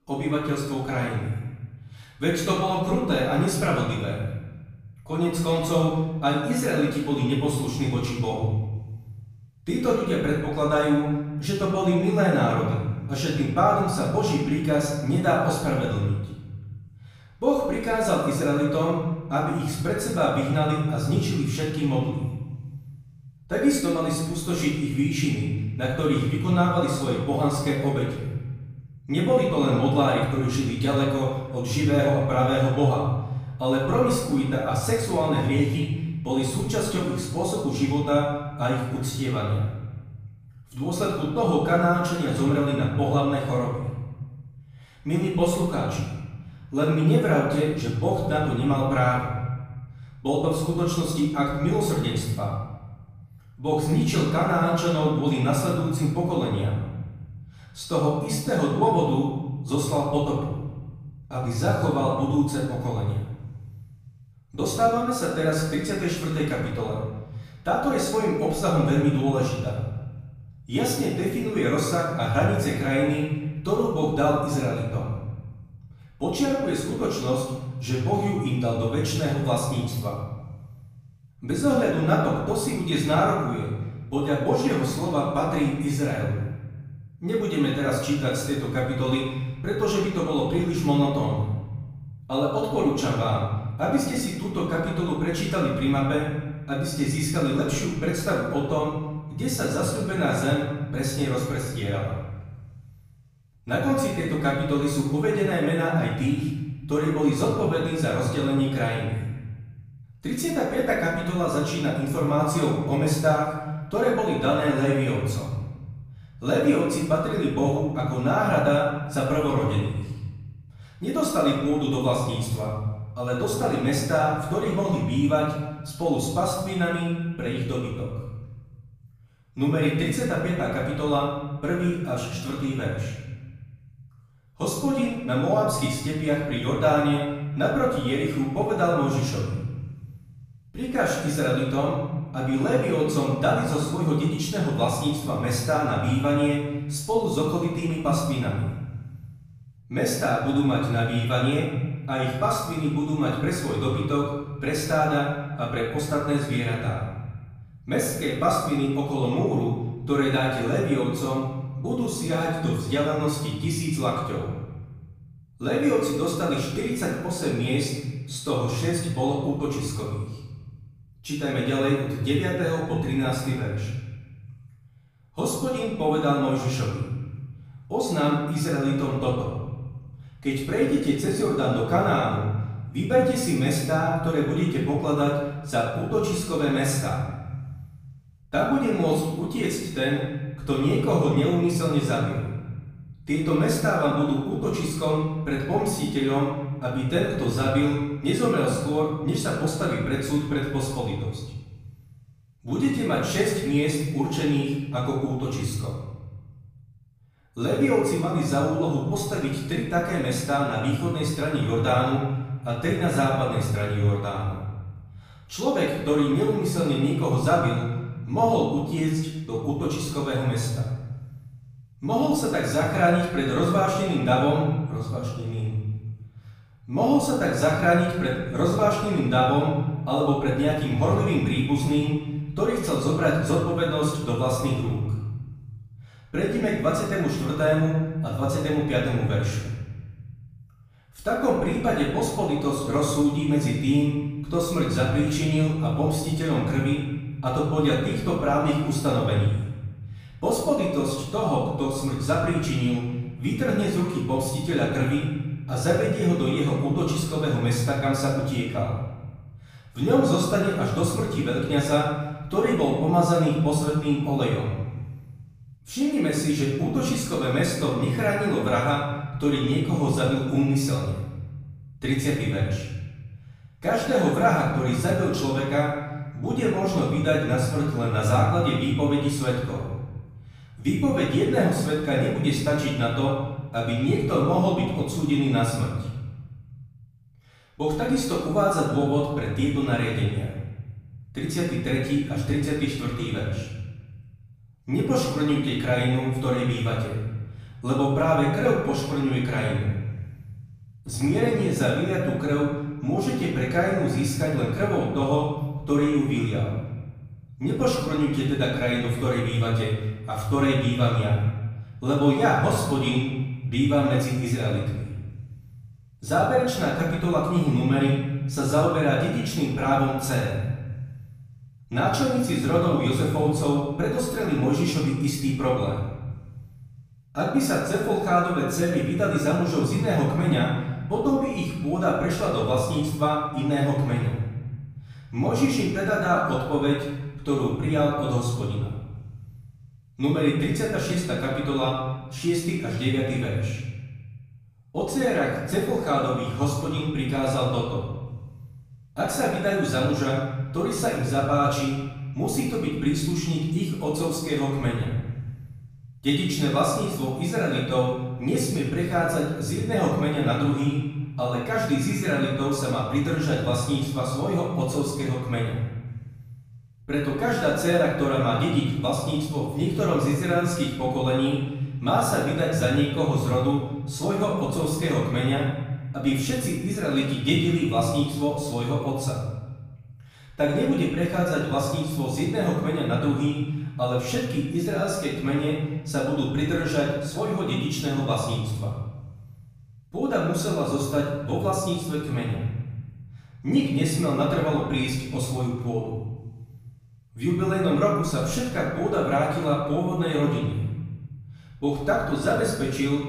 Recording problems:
off-mic speech; far
room echo; noticeable; dies away in 1.4 s

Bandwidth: 15 kHz